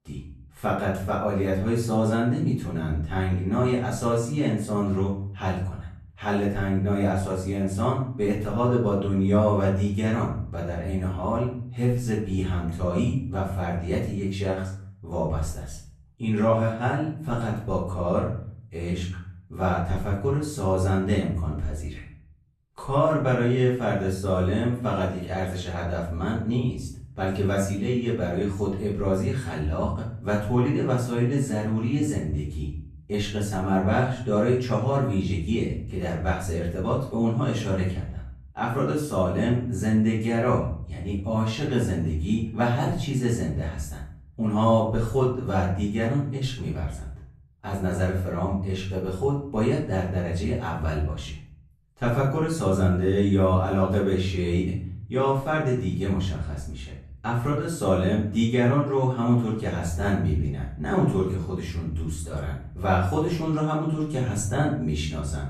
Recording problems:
off-mic speech; far
room echo; noticeable; dies away in 0.5 s

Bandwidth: 13.5 kHz